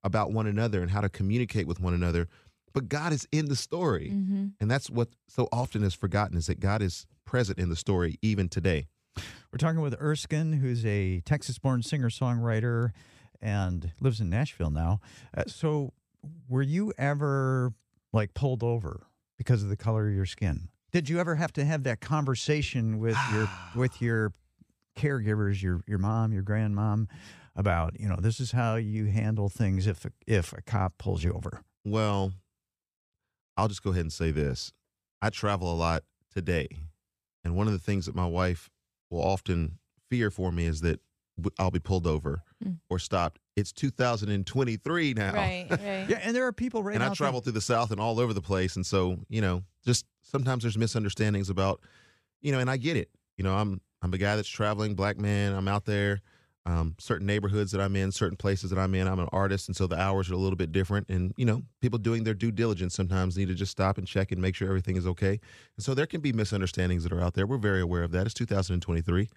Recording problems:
none

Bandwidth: 14.5 kHz